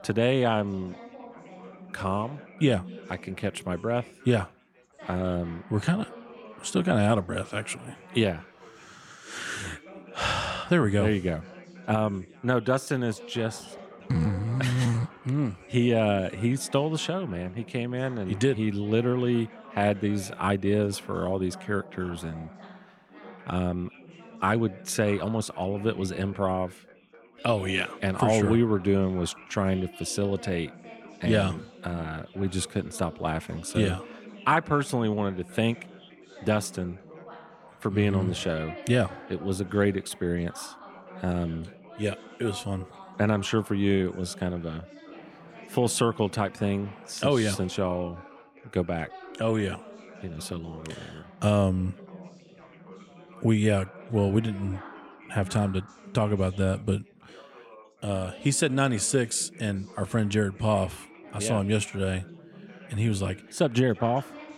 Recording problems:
background chatter; noticeable; throughout; 4 voices, 20 dB below the speech

